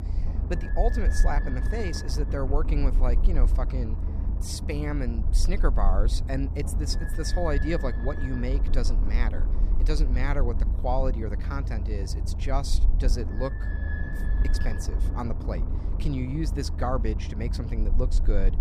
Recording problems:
low rumble; loud; throughout; 8 dB below the speech

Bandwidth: 14.5 kHz